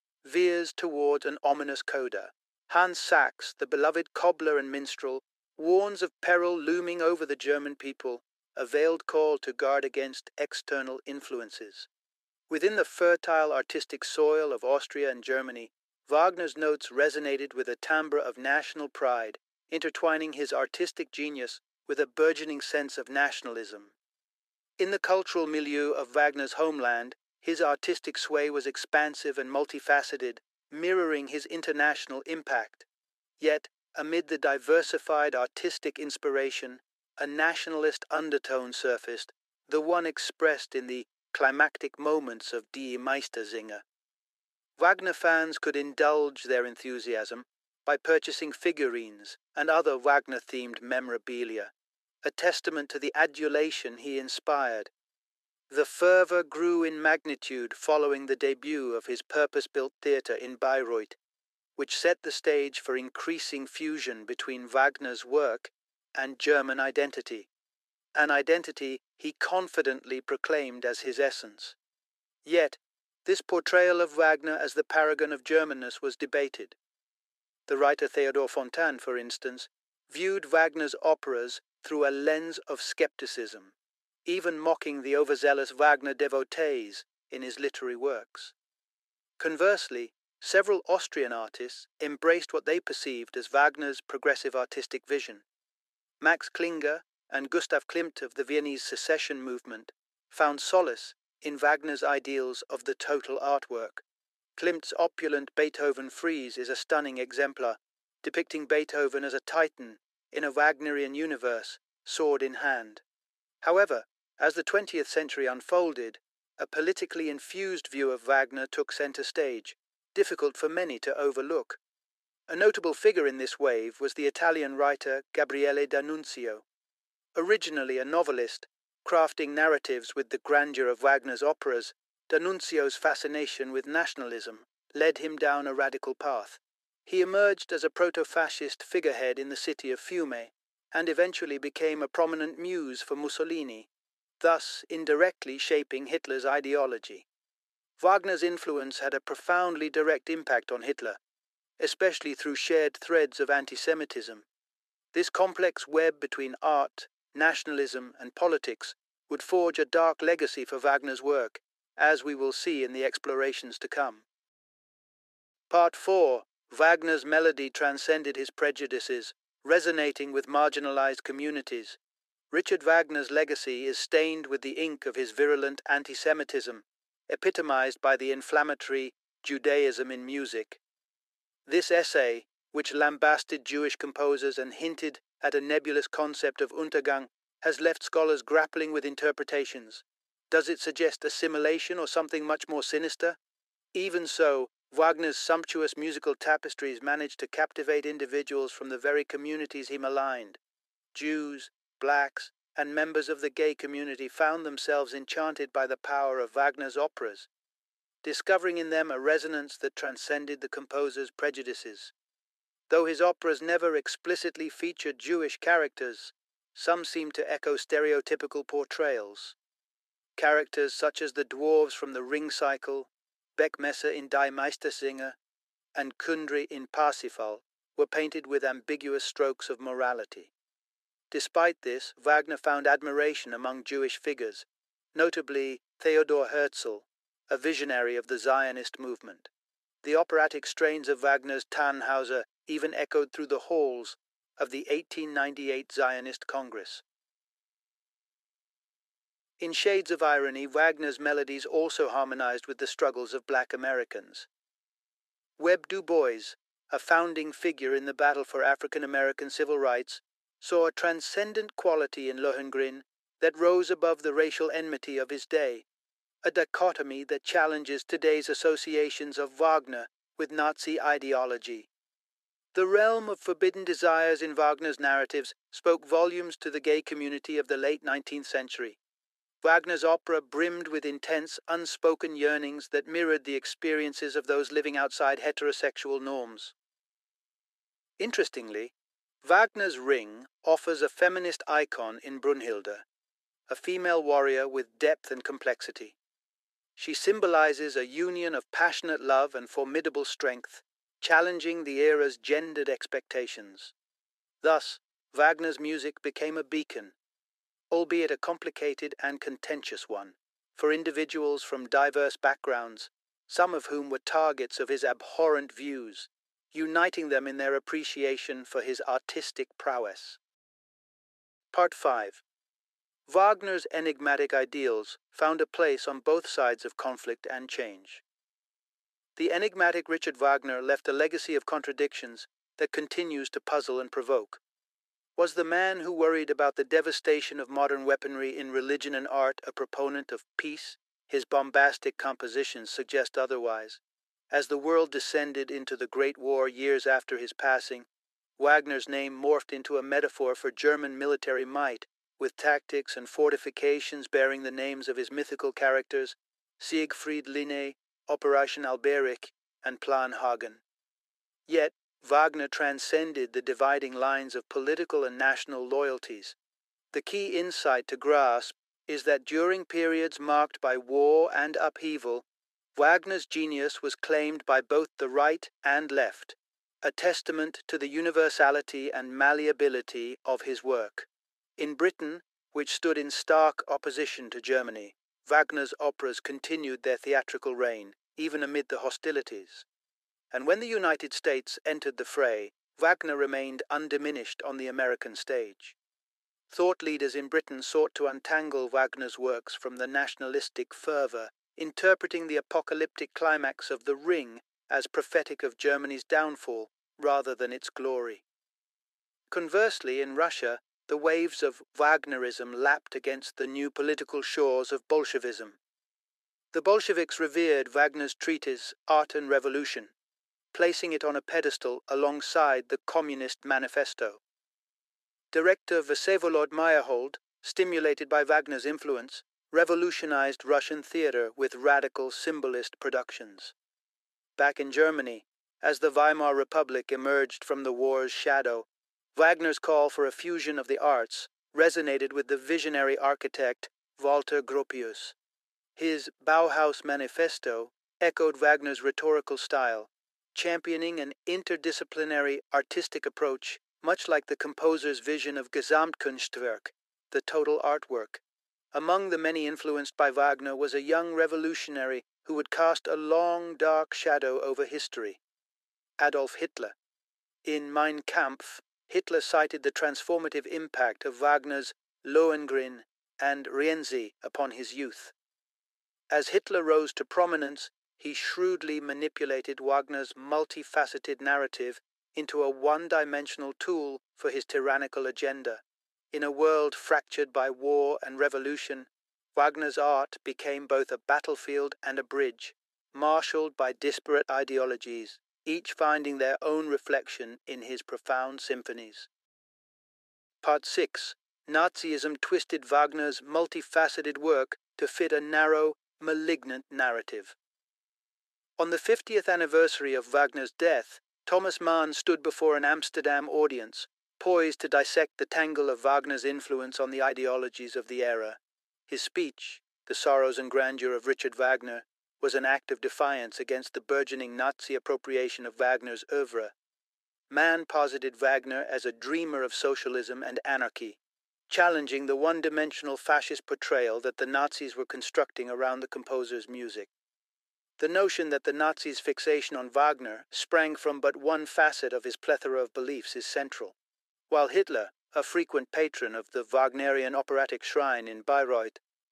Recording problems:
thin; very; fading below 400 Hz

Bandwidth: 13.5 kHz